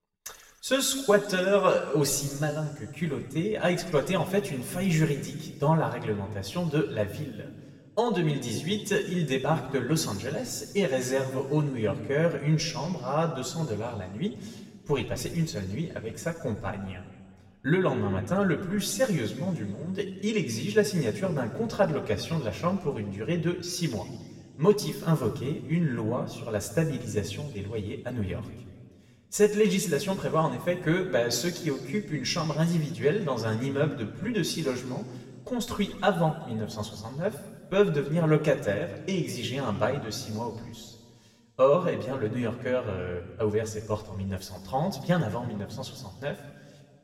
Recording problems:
room echo; slight; dies away in 1.6 s
off-mic speech; somewhat distant

